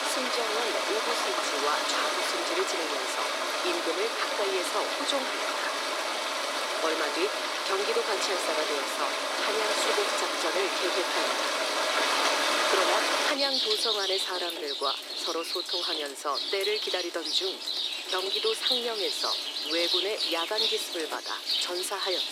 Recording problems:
thin; somewhat; fading below 300 Hz
rain or running water; very loud; throughout; 5 dB above the speech

